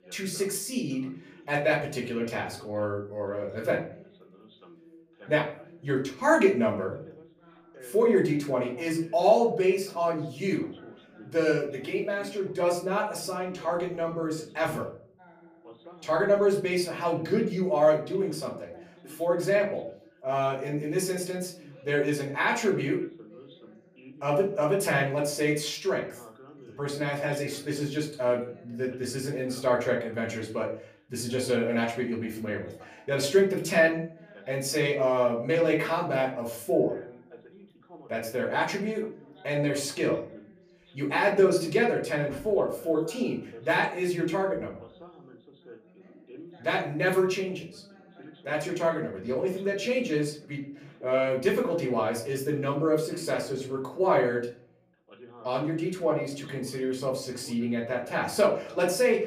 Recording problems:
off-mic speech; far
room echo; slight; dies away in 0.4 s
background chatter; faint; throughout; 2 voices, 25 dB below the speech

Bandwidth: 15 kHz